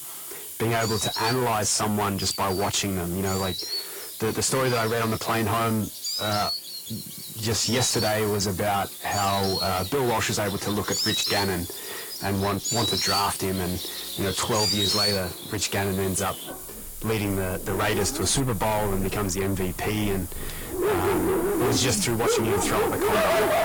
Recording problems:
distortion; heavy; 6 dB below the speech
garbled, watery; slightly; nothing above 11 kHz
animal sounds; loud; throughout; 2 dB below the speech
hiss; noticeable; throughout; 10 dB below the speech

